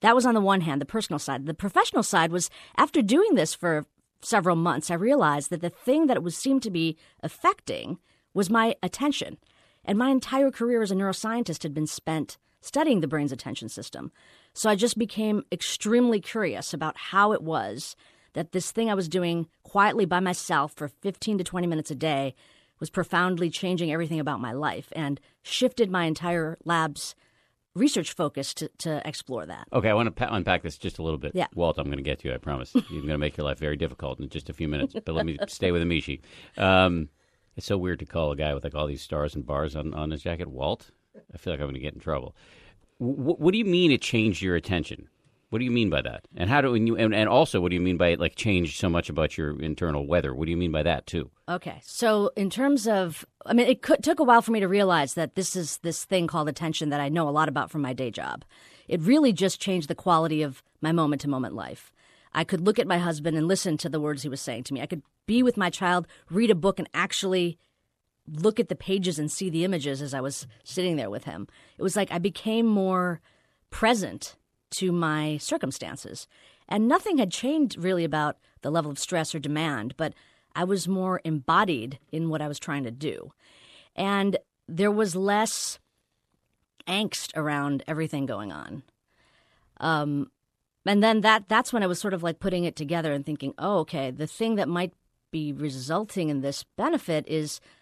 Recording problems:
none

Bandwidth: 13.5 kHz